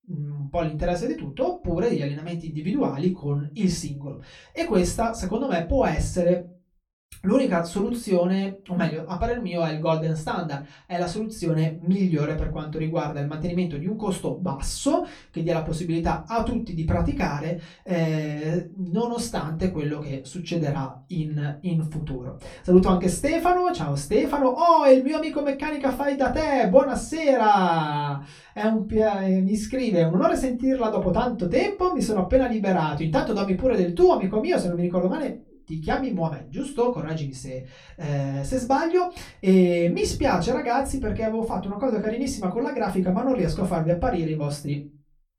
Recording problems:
off-mic speech; far
room echo; very slight; dies away in 0.2 s

